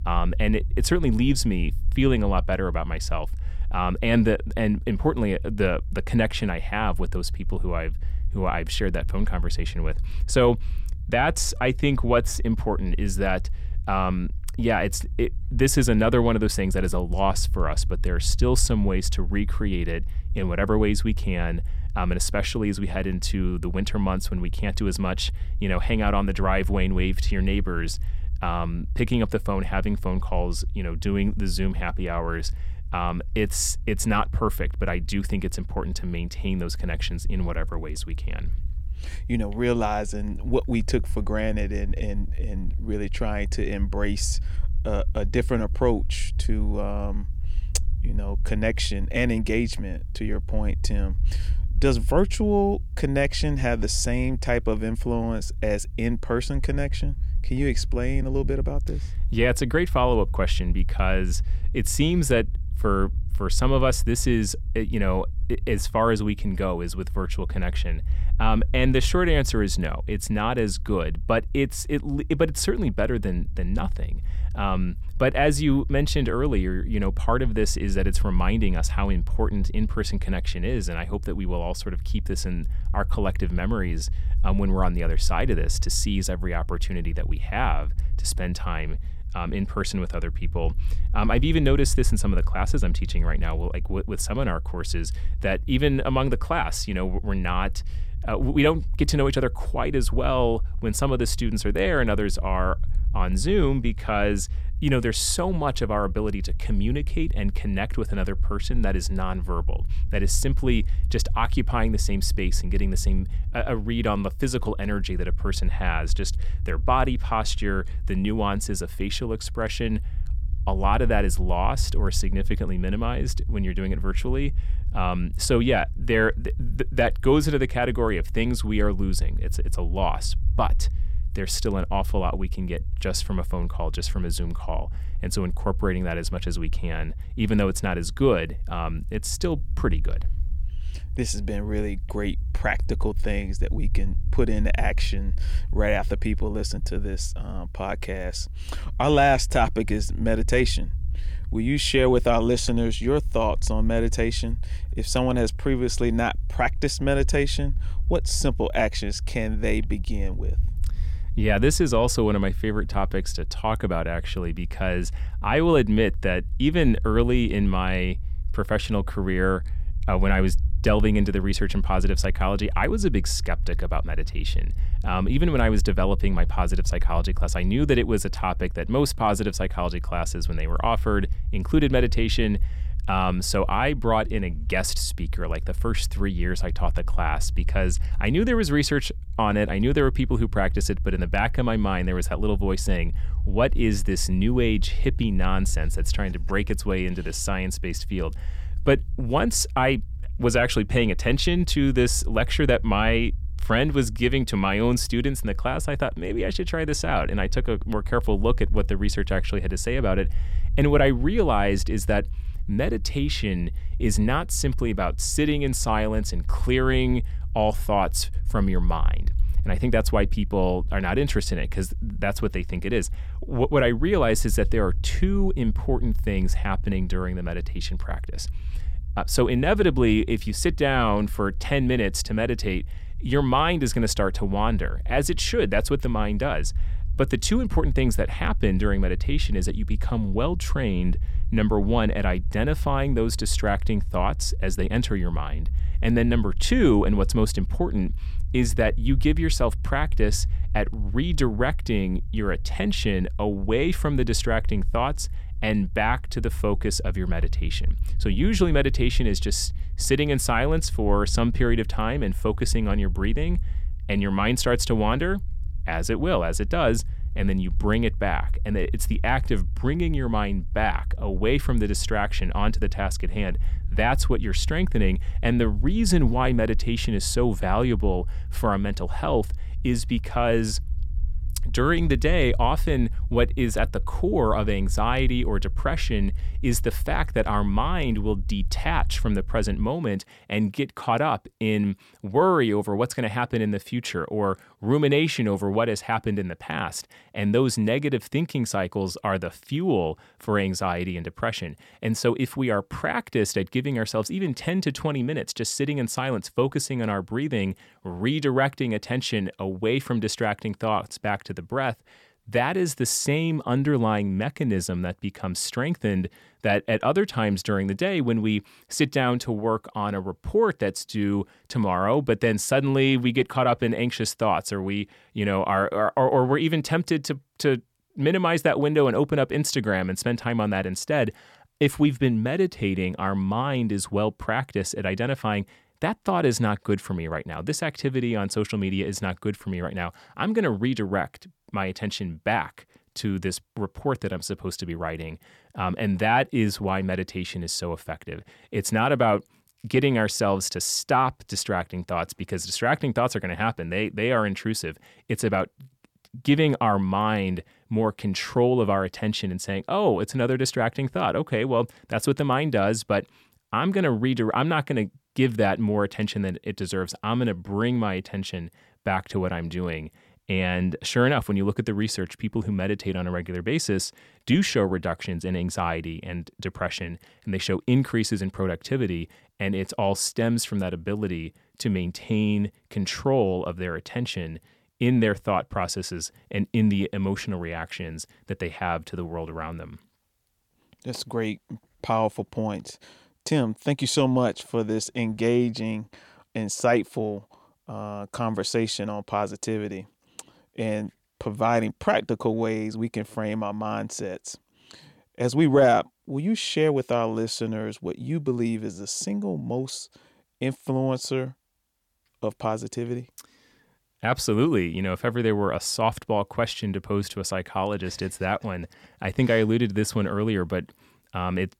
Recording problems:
low rumble; faint; until 4:50; 25 dB below the speech

